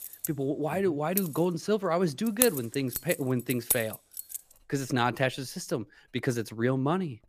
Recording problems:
household noises; loud; throughout; 3 dB below the speech

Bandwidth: 15 kHz